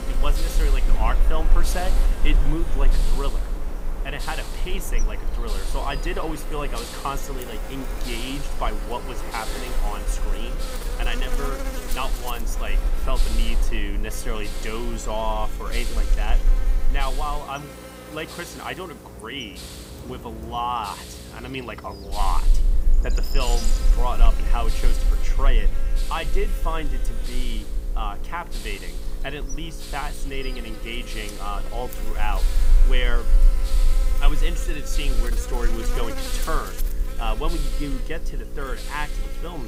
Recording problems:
electrical hum; loud; throughout; 60 Hz, 9 dB below the speech
train or aircraft noise; loud; throughout; 10 dB below the speech
hiss; loud; throughout; 9 dB below the speech
low rumble; faint; until 17 s and from 22 s on; 25 dB below the speech
abrupt cut into speech; at the end

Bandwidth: 15.5 kHz